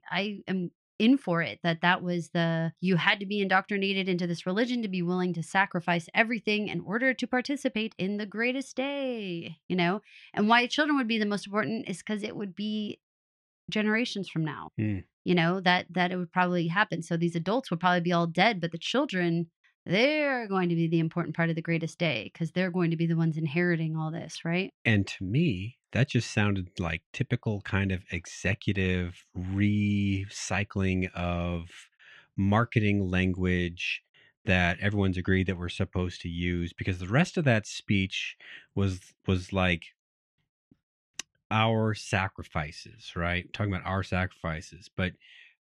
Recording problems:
muffled; slightly; fading above 3 kHz

